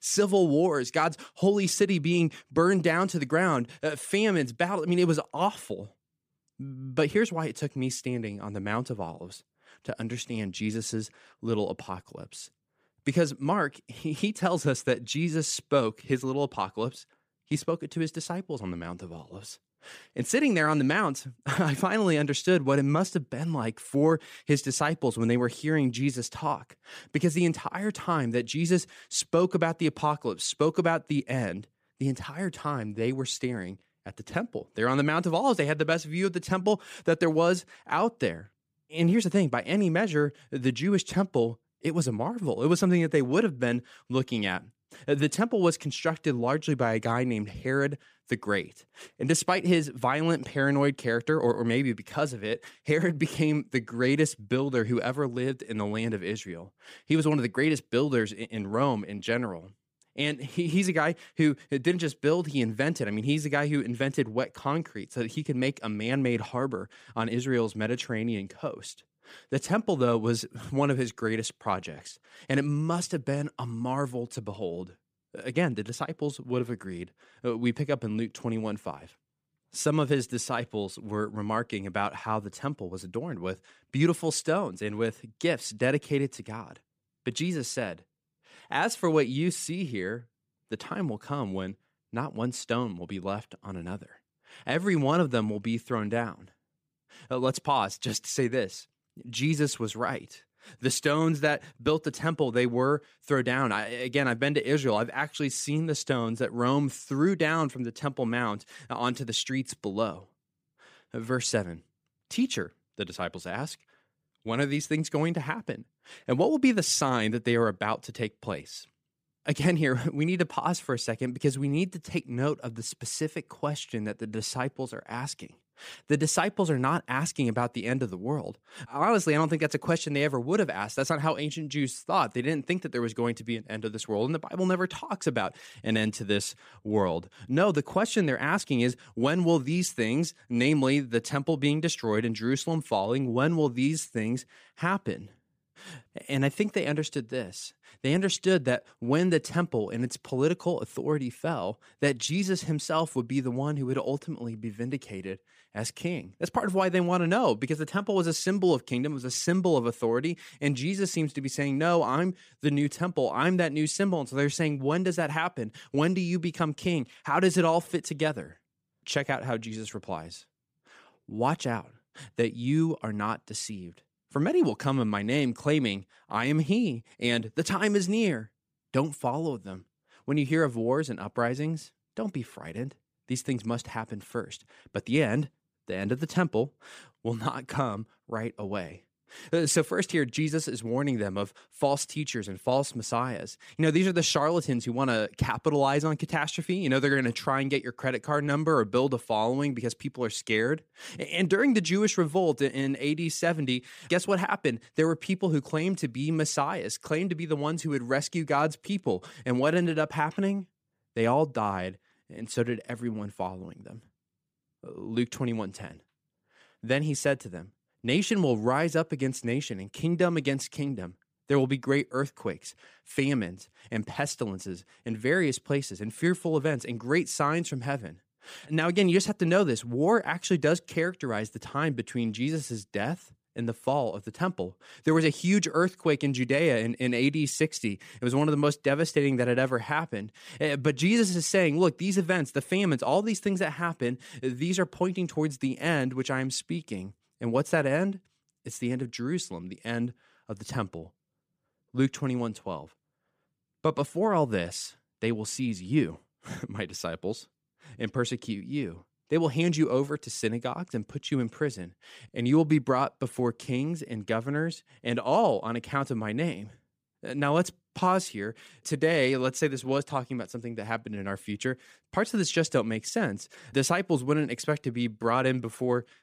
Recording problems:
none

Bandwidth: 15 kHz